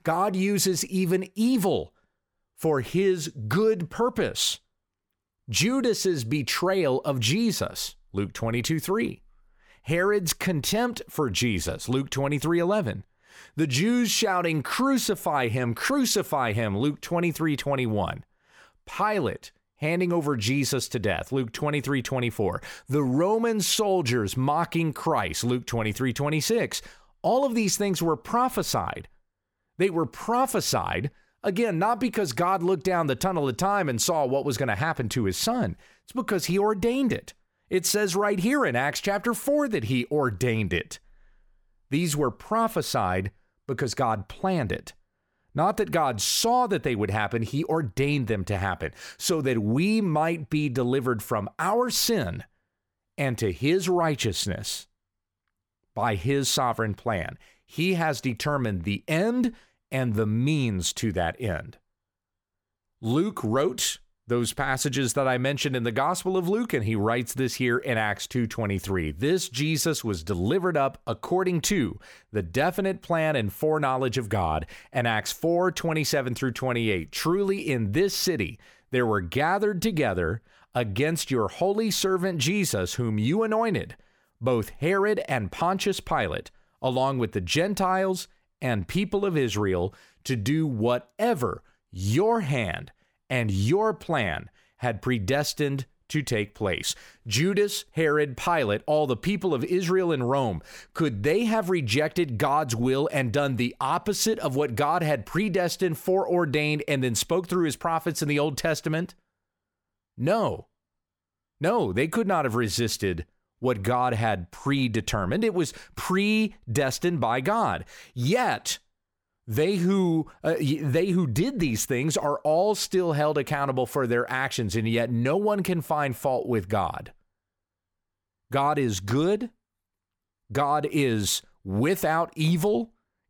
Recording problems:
none

